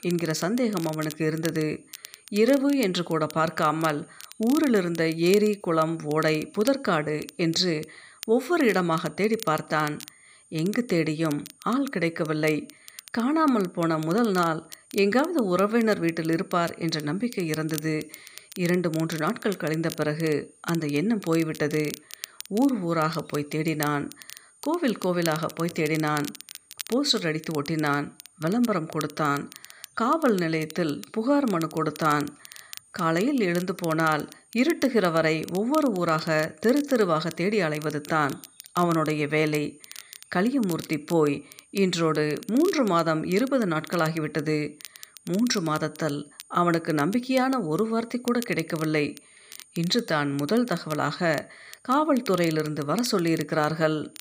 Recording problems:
crackle, like an old record; noticeable; 20 dB below the speech
high-pitched whine; faint; throughout; 9 kHz, 30 dB below the speech

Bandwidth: 15 kHz